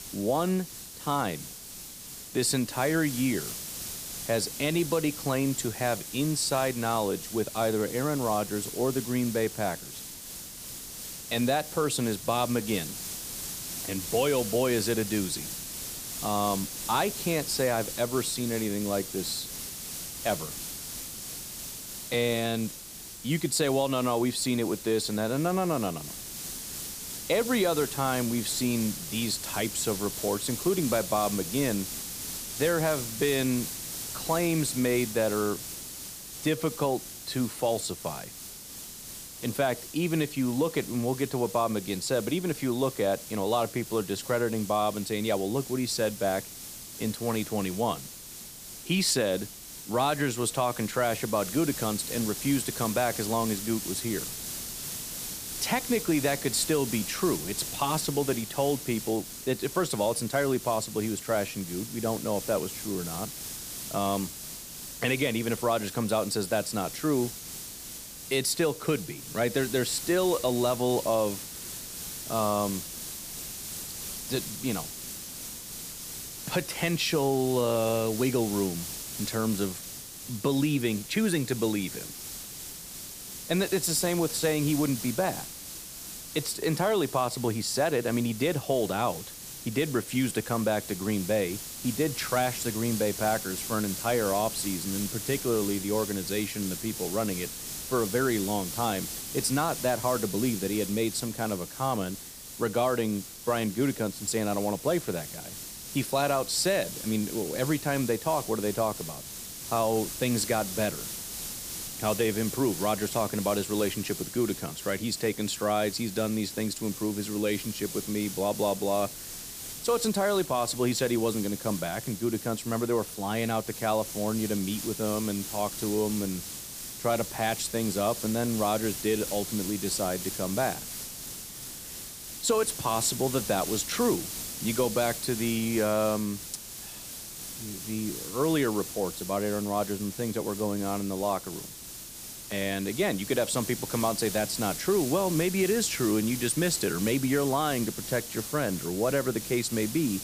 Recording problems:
hiss; loud; throughout; 7 dB below the speech

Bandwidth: 15 kHz